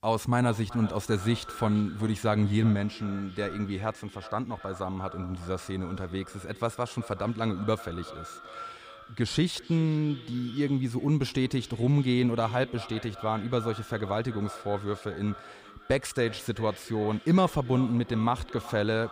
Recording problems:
echo of what is said; noticeable; throughout; 370 ms later, 15 dB below the speech

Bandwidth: 15.5 kHz